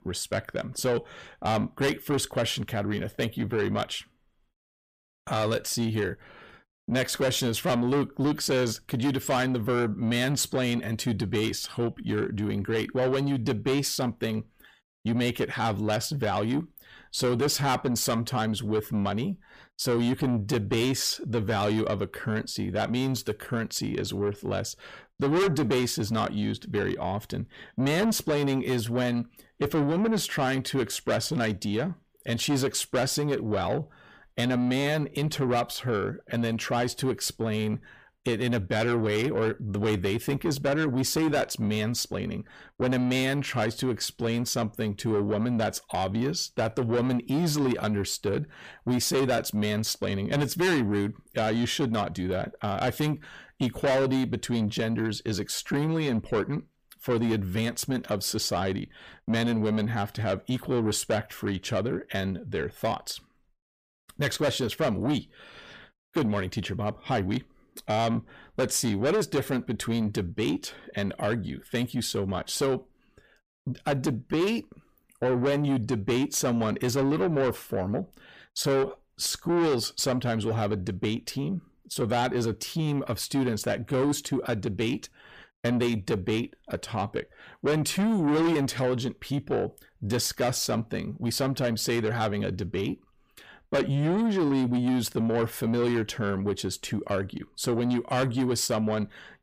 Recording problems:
distortion; heavy; 7 dB below the speech

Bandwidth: 15 kHz